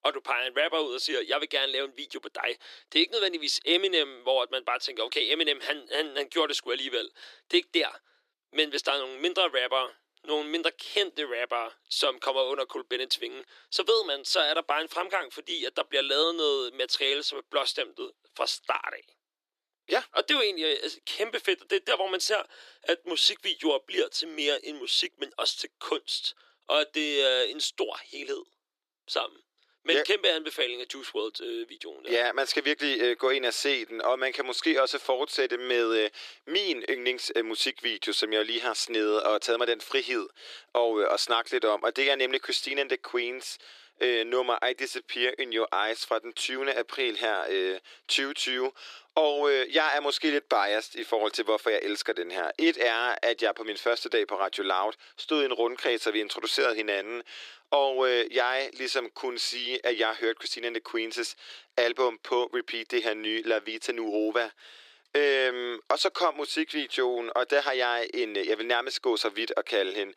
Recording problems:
thin; very; fading below 300 Hz

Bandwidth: 14.5 kHz